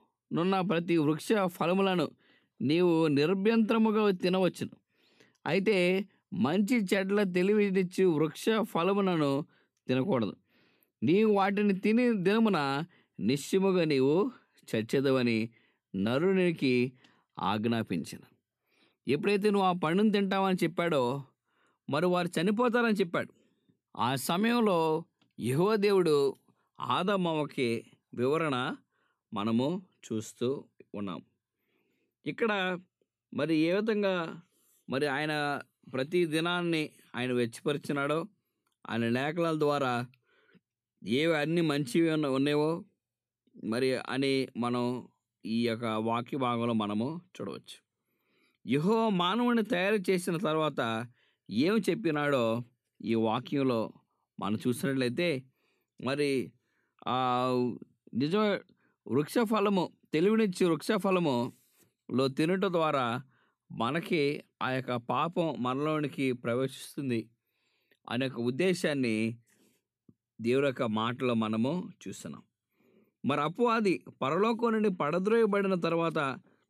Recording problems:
none

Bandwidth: 14 kHz